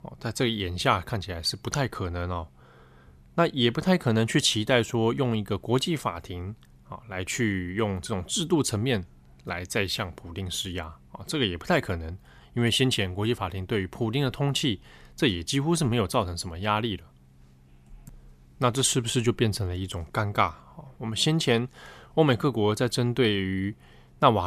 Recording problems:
abrupt cut into speech; at the end

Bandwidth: 14.5 kHz